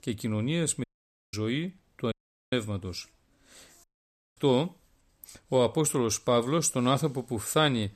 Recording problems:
audio cutting out; at 1 s, at 2 s and at 4 s for 0.5 s

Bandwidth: 14 kHz